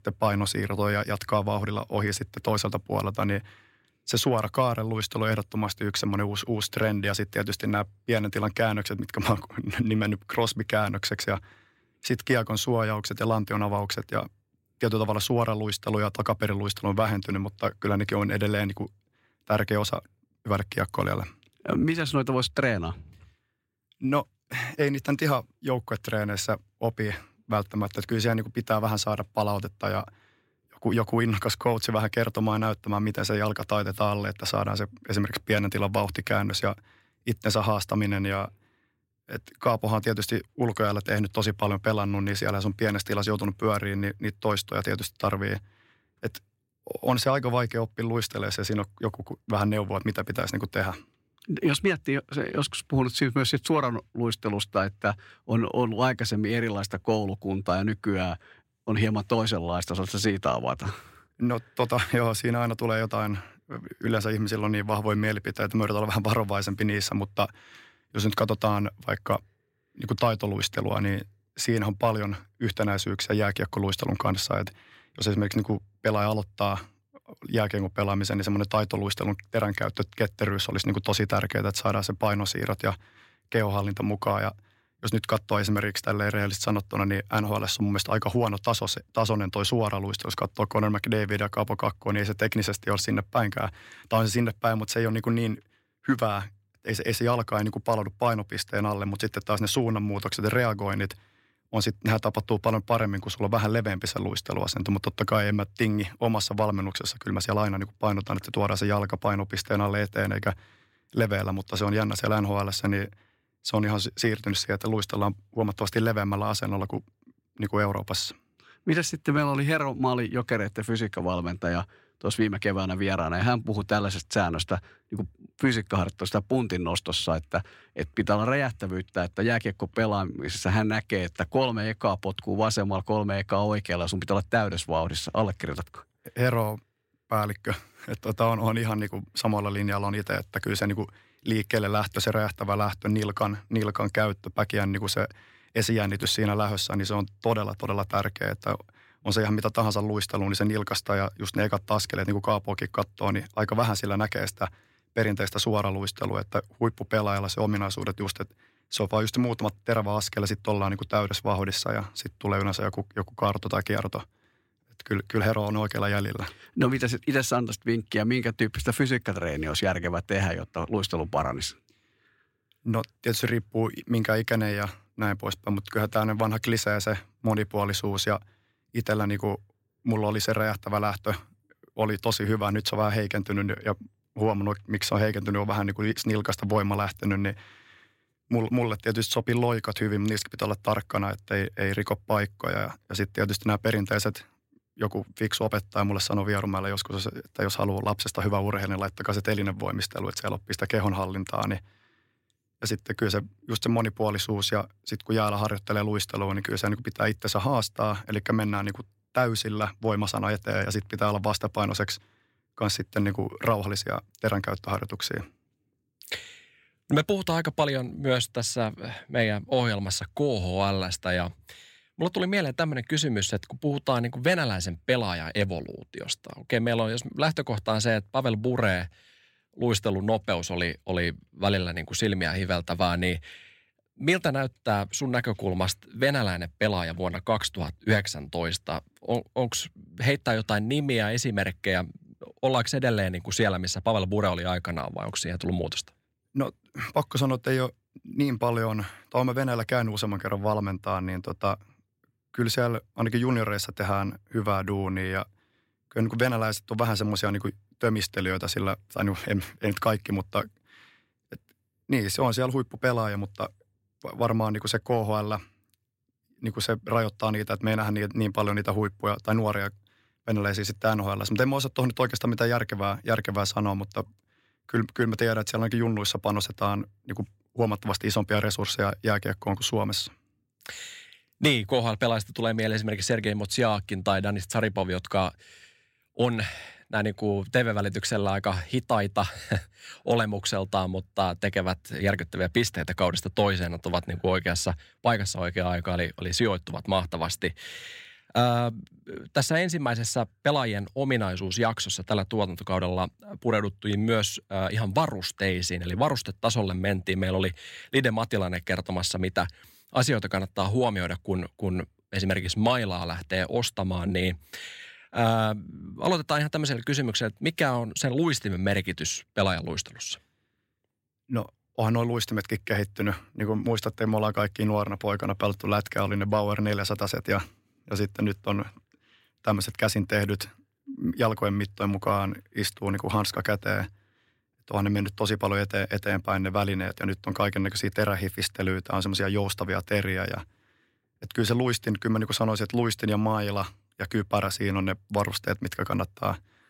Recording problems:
none

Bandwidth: 16 kHz